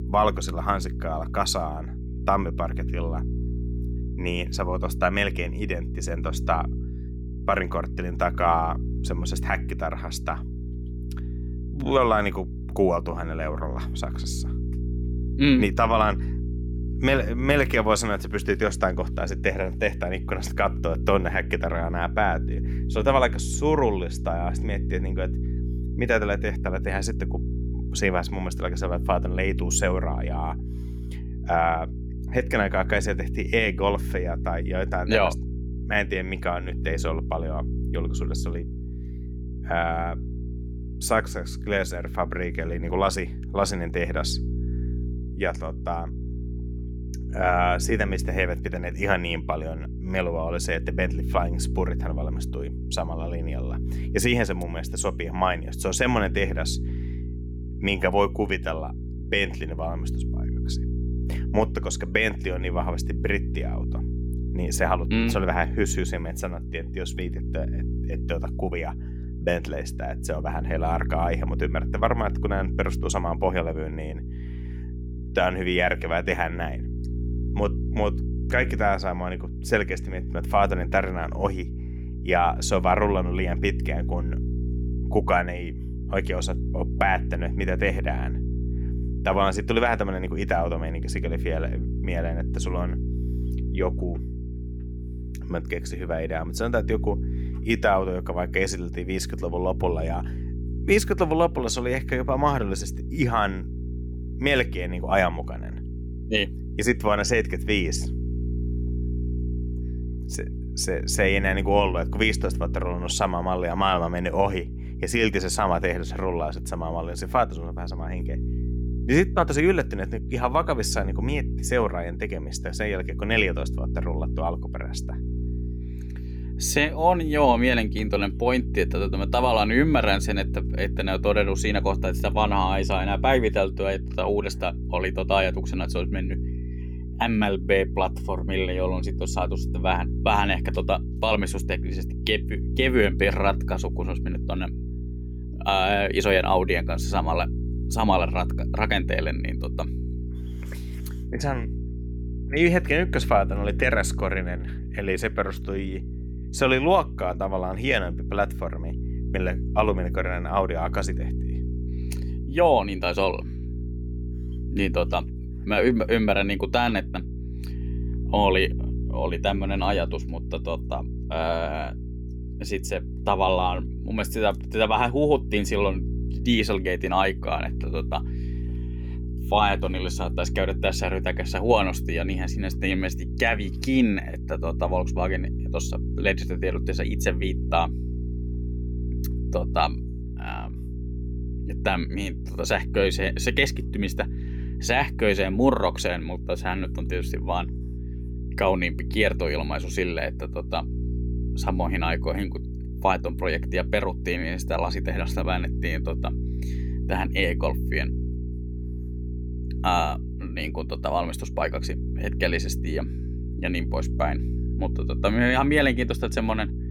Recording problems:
electrical hum; noticeable; throughout; 60 Hz, 15 dB below the speech

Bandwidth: 17 kHz